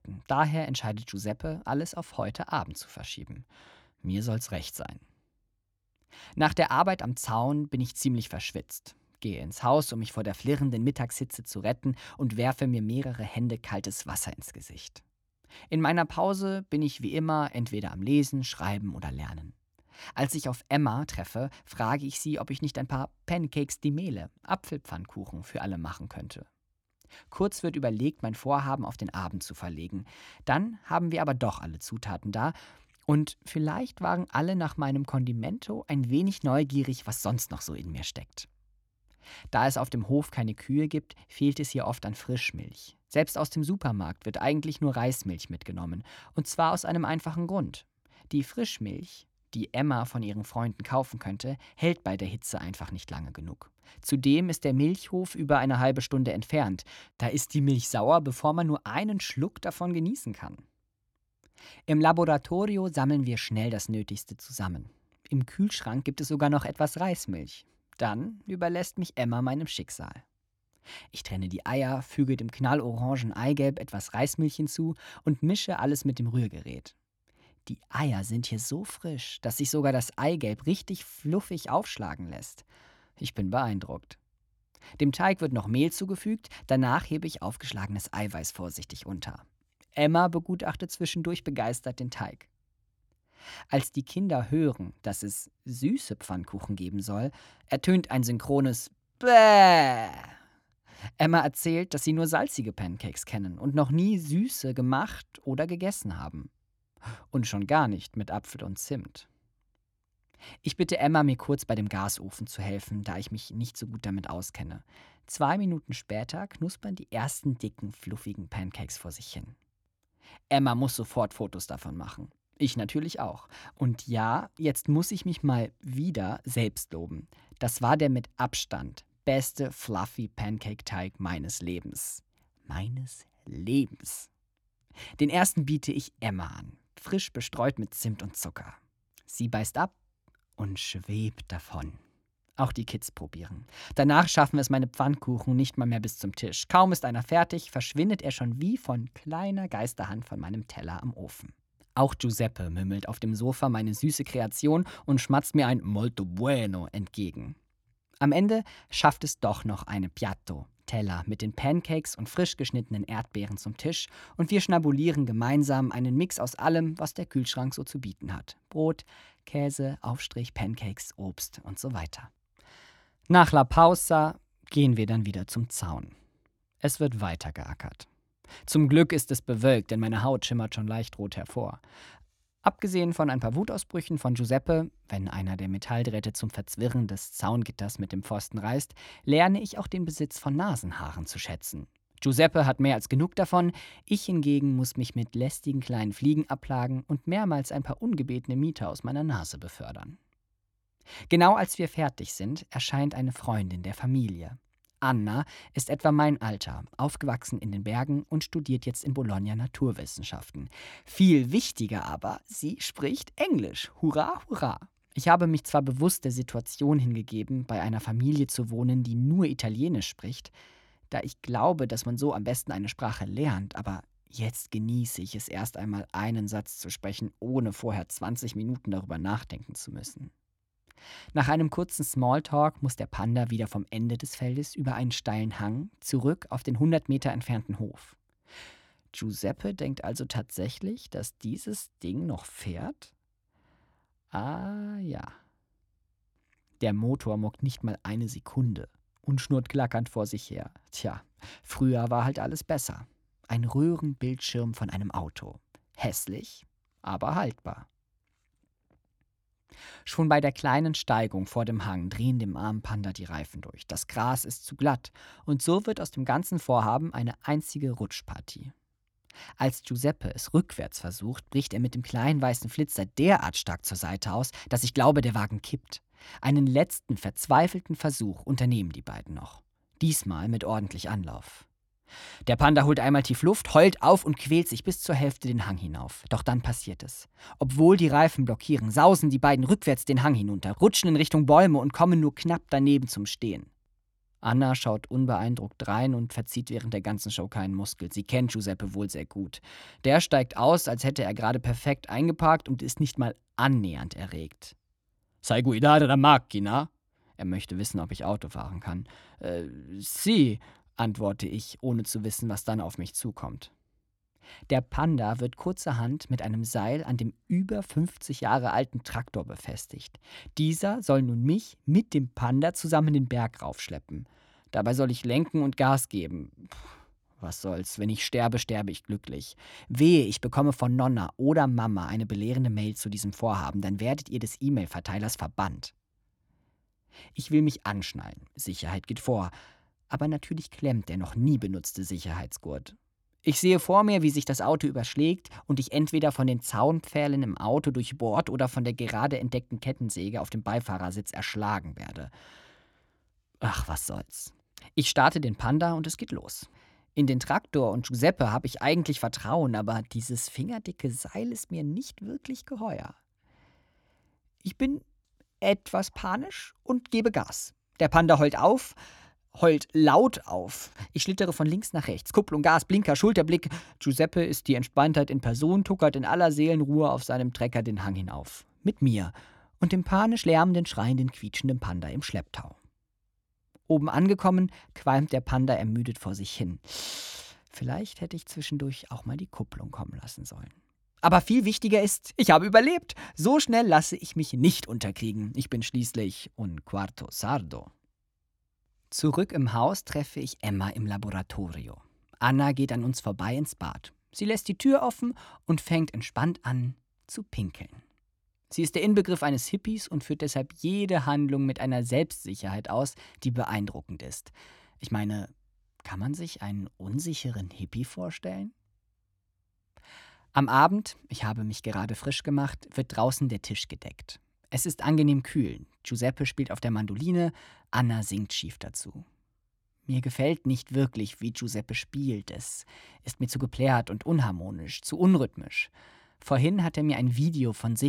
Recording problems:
abrupt cut into speech; at the end

